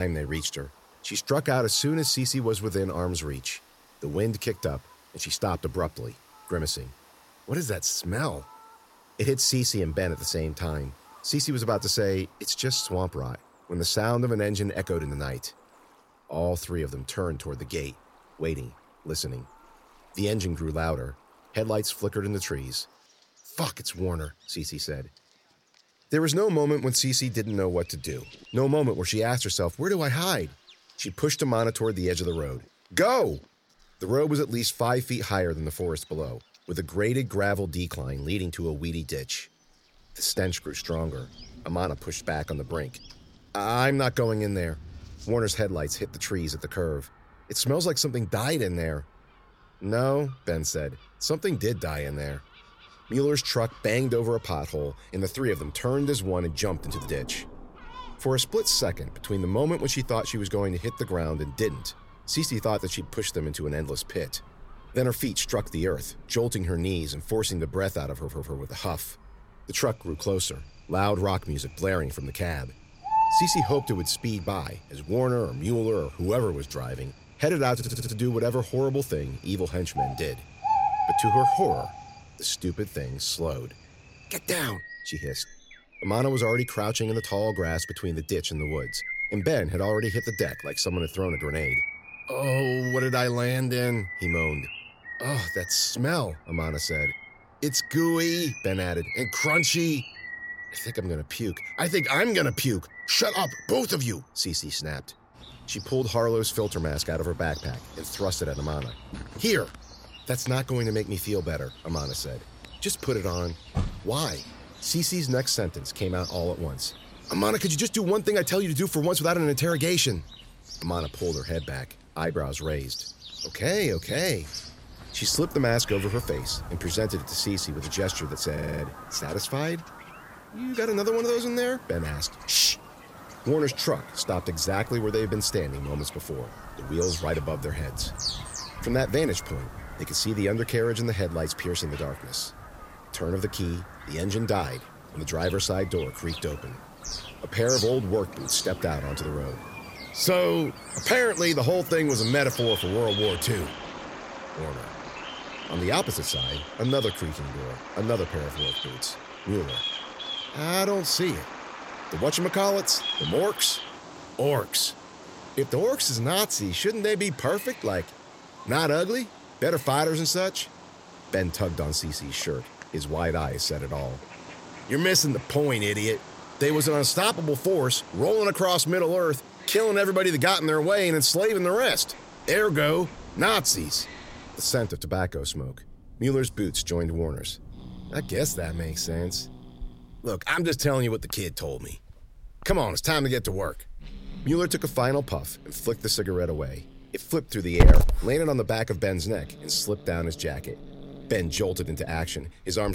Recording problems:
animal sounds; loud; throughout; 8 dB below the speech
rain or running water; faint; throughout; 30 dB below the speech
abrupt cut into speech; at the start and the end
audio stuttering; at 1:08, at 1:18 and at 2:09

